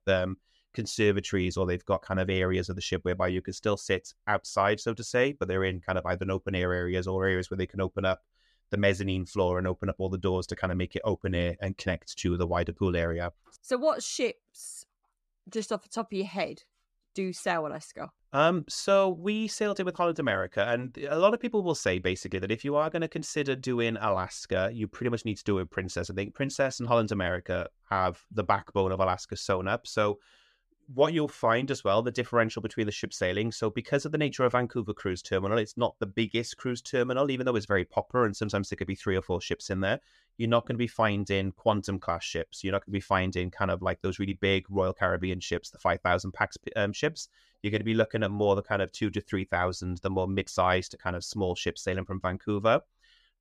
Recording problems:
none

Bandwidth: 14 kHz